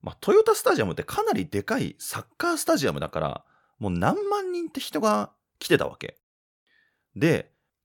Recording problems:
none

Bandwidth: 17.5 kHz